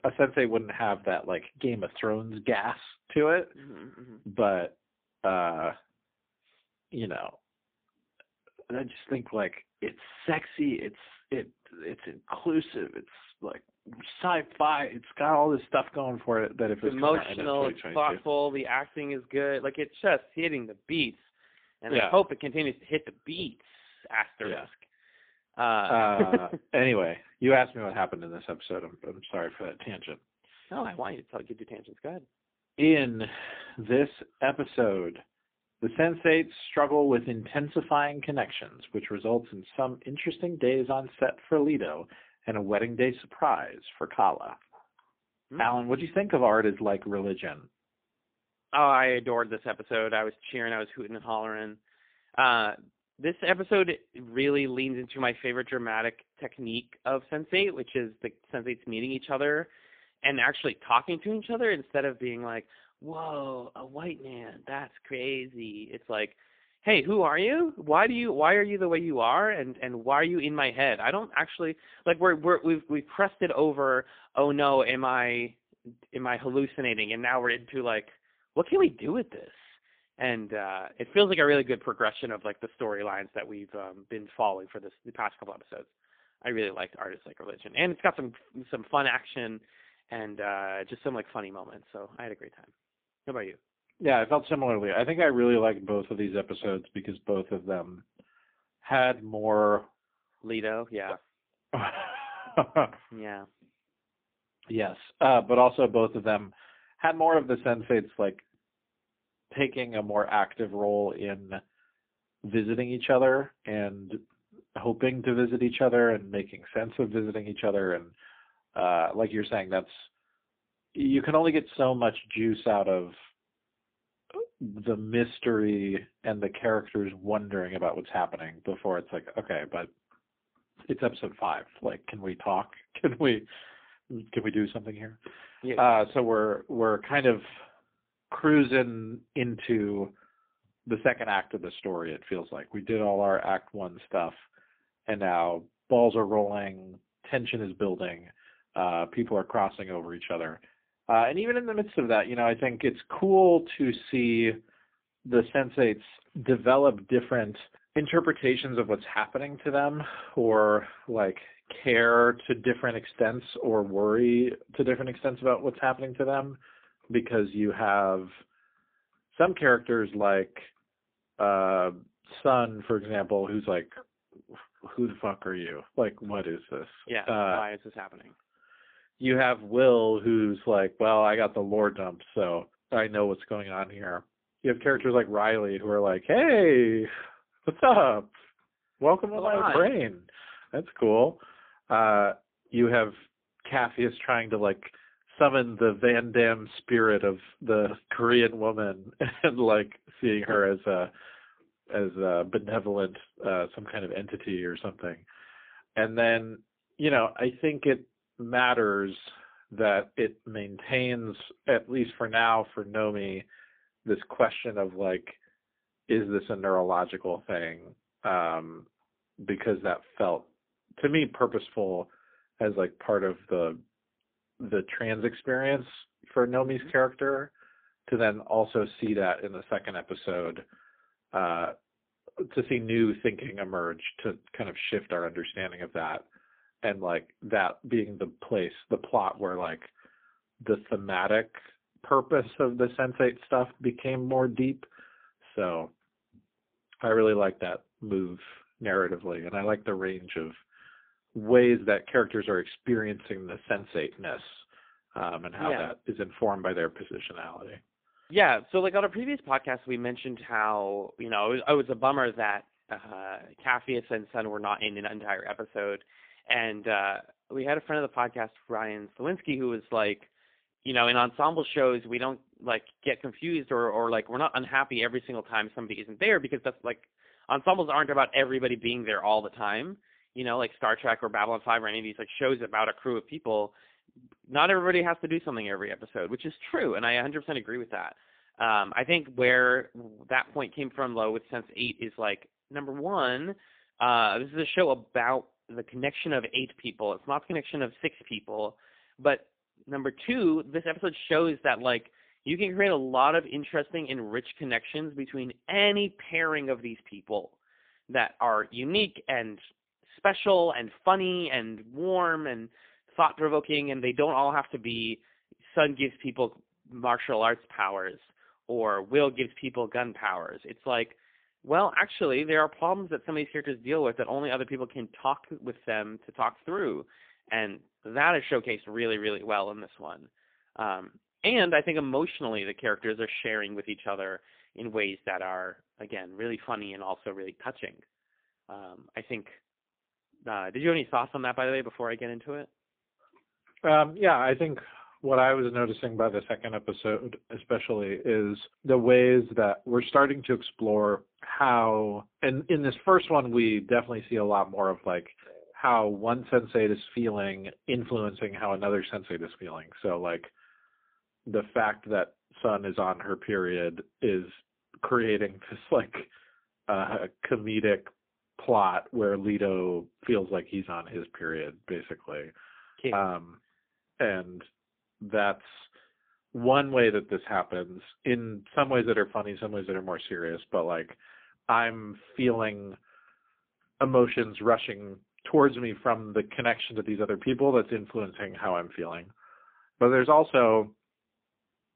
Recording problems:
phone-call audio; poor line

